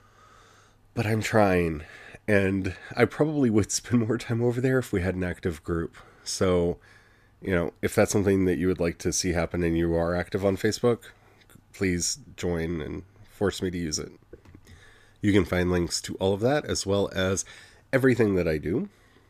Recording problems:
none

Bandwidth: 14.5 kHz